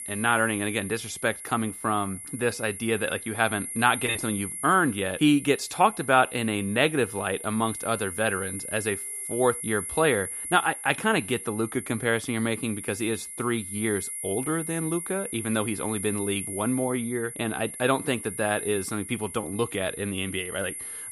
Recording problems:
high-pitched whine; loud; throughout; 11 kHz, 8 dB below the speech

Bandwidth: 14.5 kHz